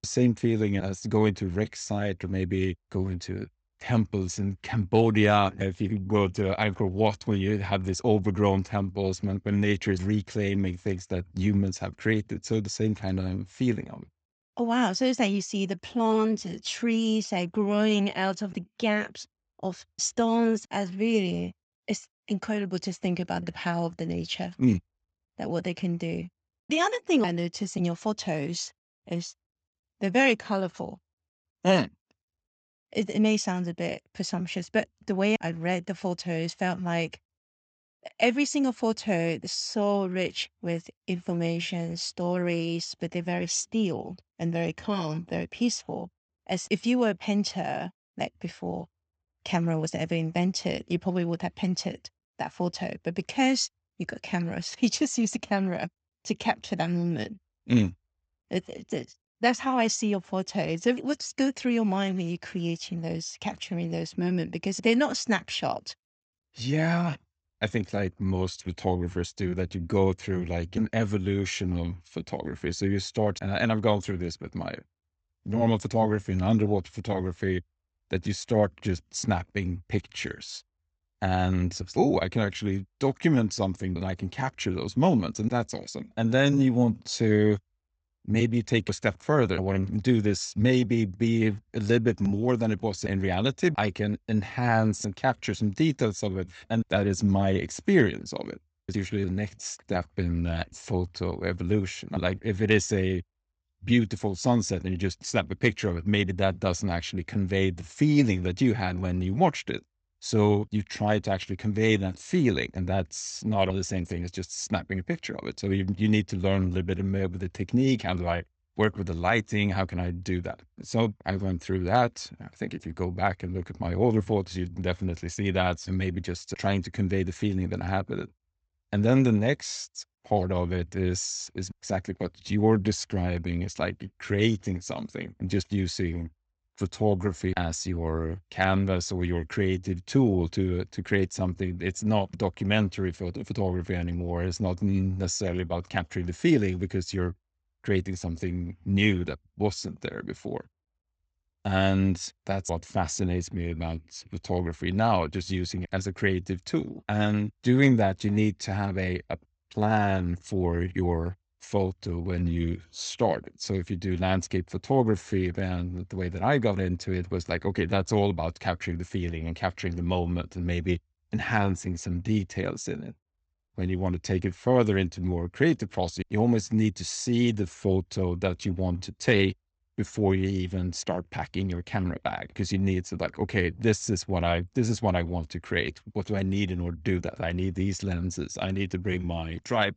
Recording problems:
high frequencies cut off; noticeable; nothing above 8 kHz

